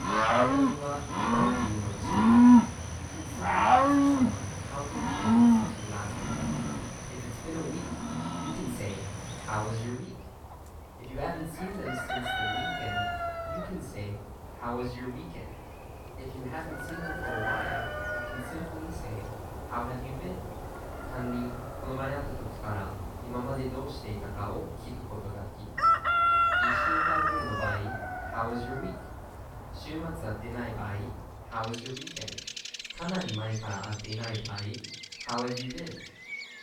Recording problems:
off-mic speech; far
room echo; noticeable; dies away in 0.5 s
animal sounds; very loud; throughout; 10 dB above the speech
voice in the background; faint; throughout; 30 dB below the speech

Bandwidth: 17 kHz